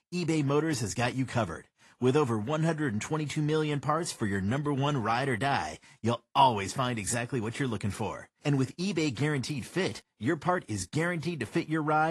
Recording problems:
garbled, watery; slightly; nothing above 11 kHz
abrupt cut into speech; at the end

